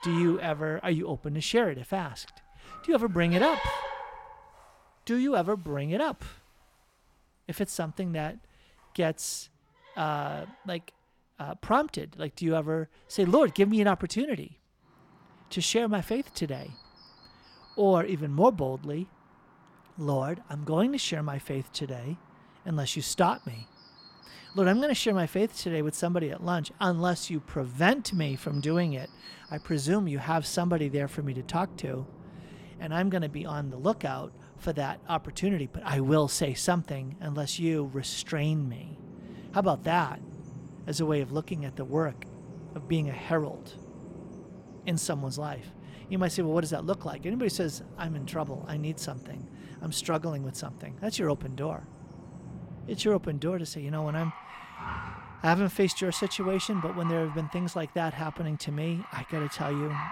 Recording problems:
animal sounds; noticeable; throughout; 15 dB below the speech

